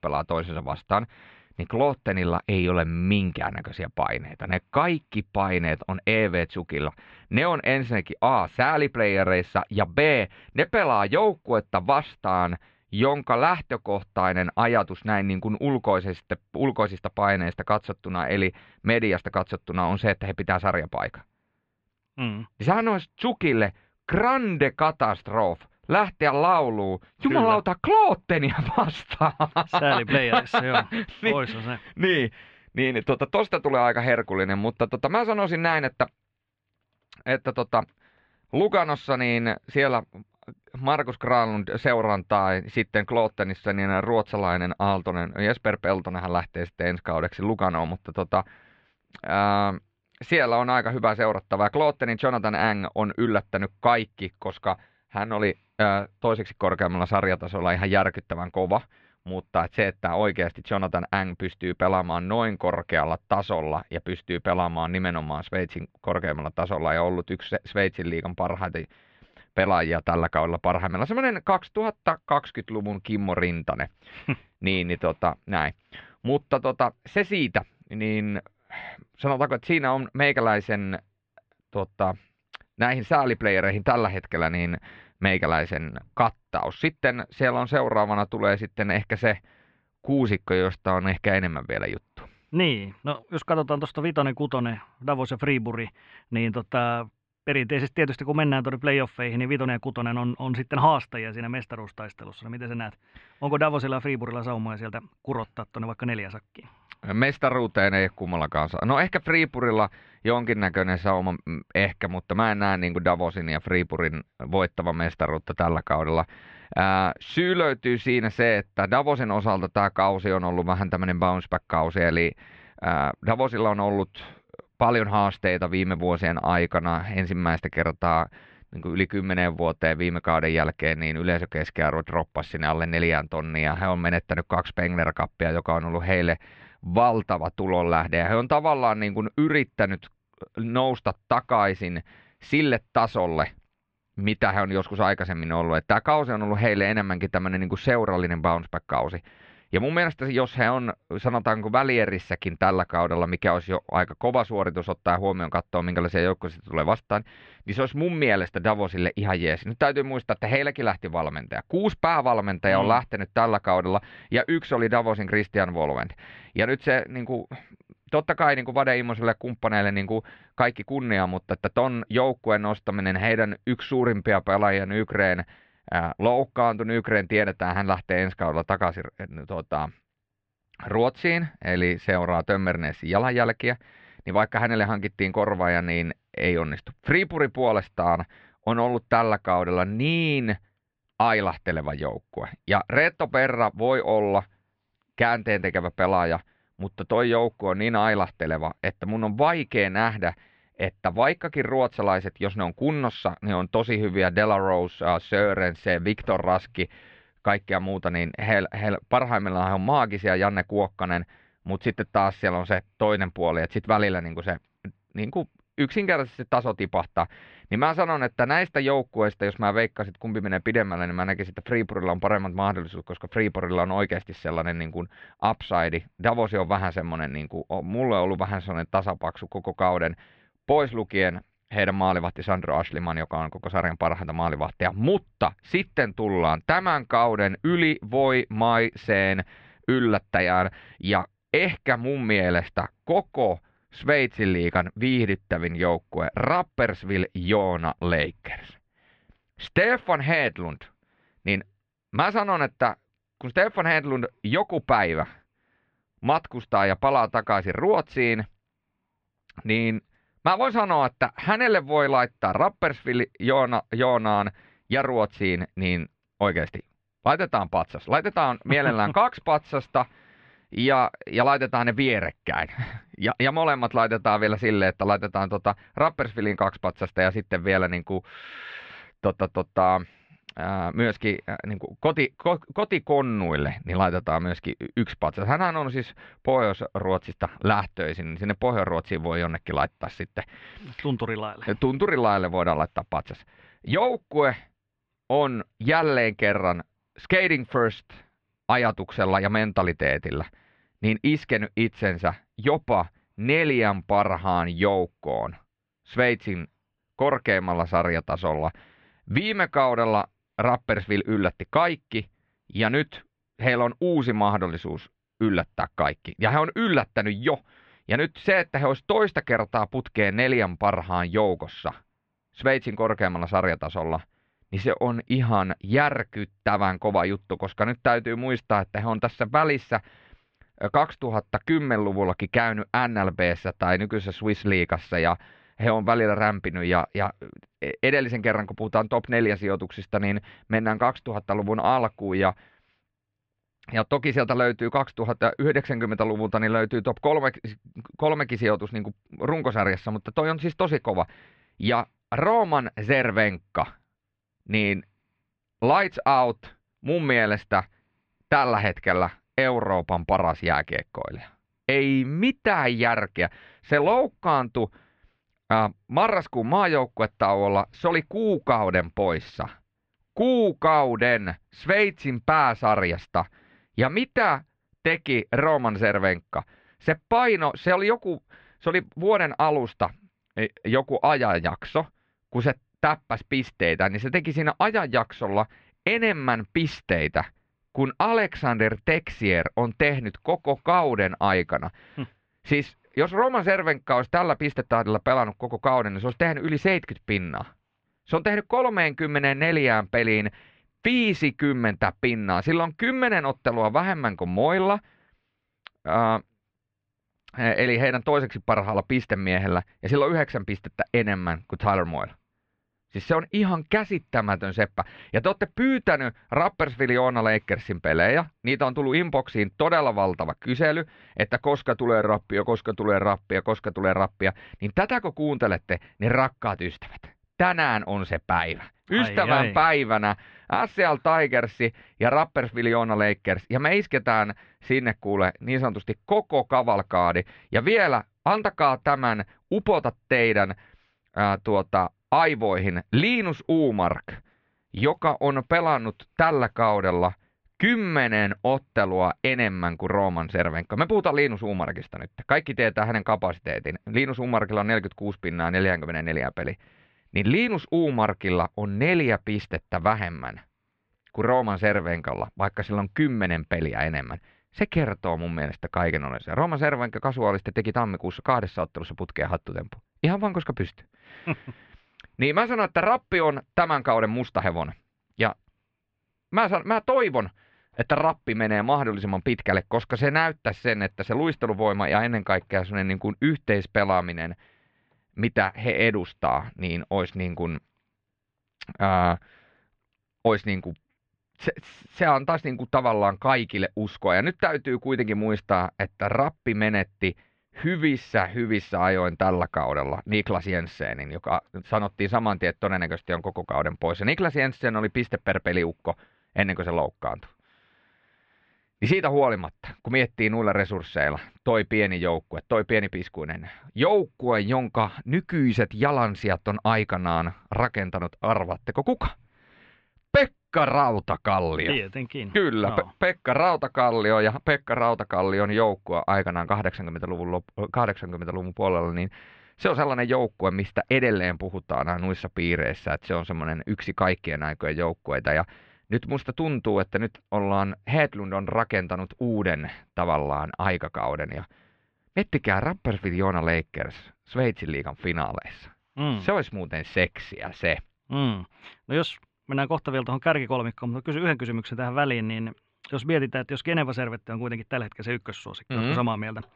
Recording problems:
muffled; slightly; fading above 3.5 kHz

